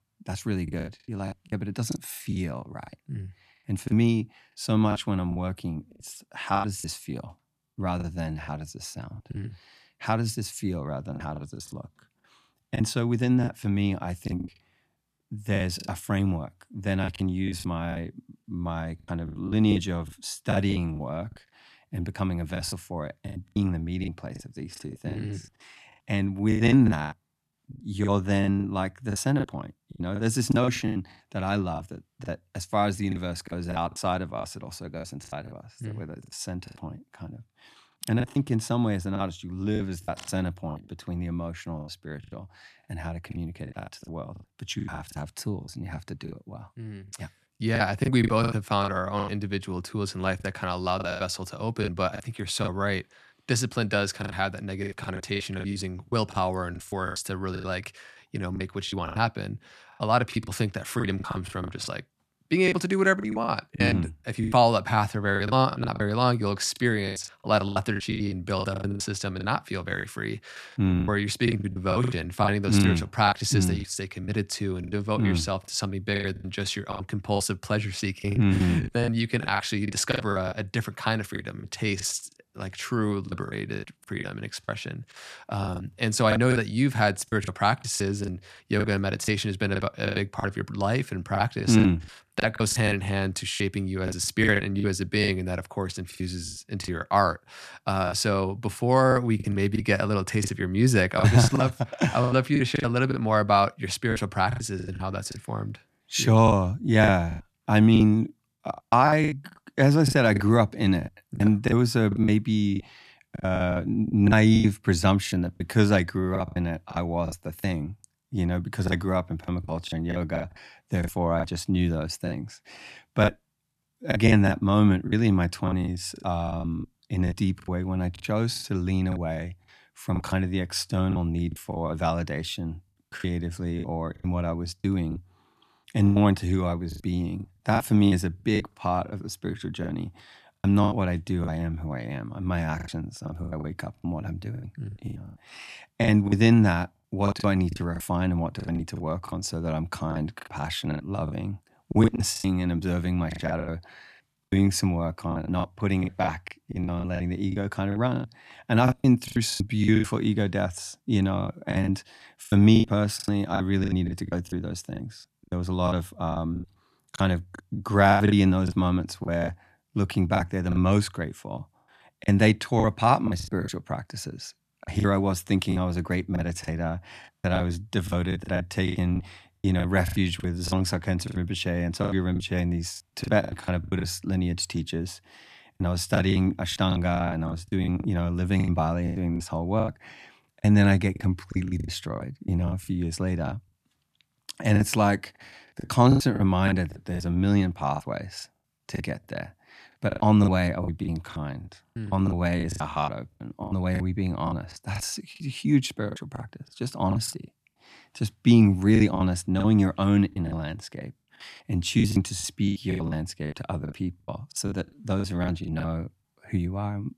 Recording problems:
choppy; very; 13% of the speech affected

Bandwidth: 14 kHz